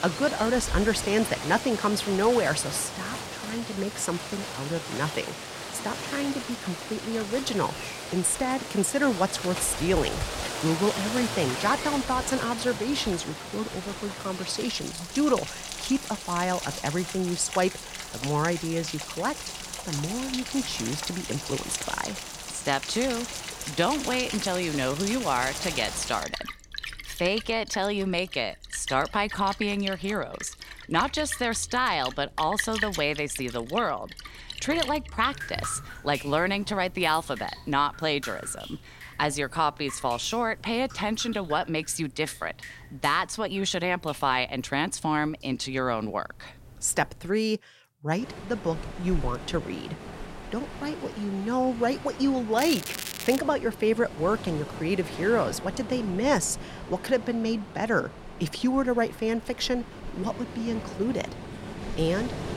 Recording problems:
rain or running water; loud; throughout; 8 dB below the speech
crackling; loud; at 53 s; 6 dB below the speech

